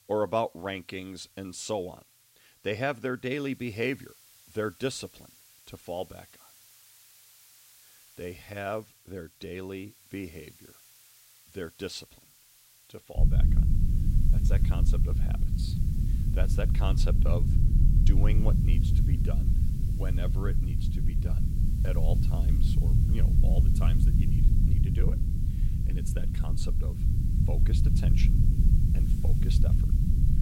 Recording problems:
low rumble; loud; from 13 s on; 5 dB below the speech
hiss; noticeable; throughout; 20 dB below the speech

